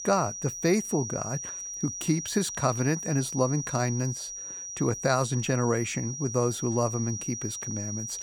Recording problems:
high-pitched whine; loud; throughout; 6 kHz, 6 dB below the speech

